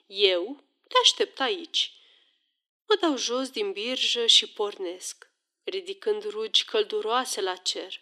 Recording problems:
thin; somewhat; fading below 300 Hz

